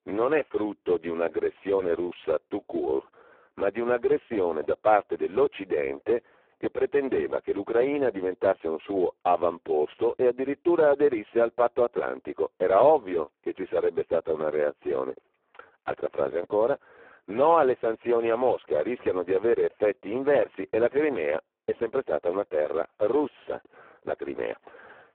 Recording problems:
phone-call audio; poor line; nothing above 3.5 kHz

